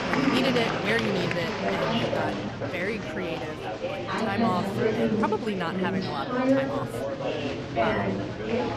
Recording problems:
chatter from many people; very loud; throughout; 3 dB above the speech

